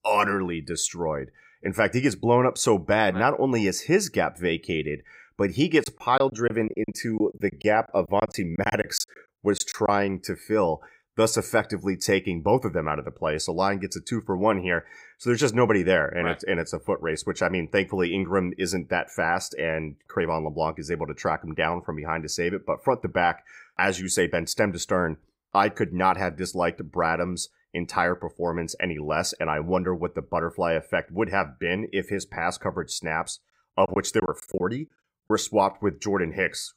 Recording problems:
choppy; very; from 6 to 10 s and from 34 to 35 s; 15% of the speech affected

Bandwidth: 15.5 kHz